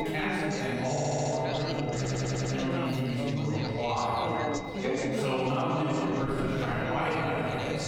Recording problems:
room echo; strong; dies away in 2.2 s
off-mic speech; far
squashed, flat; somewhat
background chatter; loud; throughout; 4 voices, 5 dB below the speech
high-pitched whine; noticeable; throughout; 2 kHz, 15 dB below the speech
audio stuttering; at 1 s and at 2 s

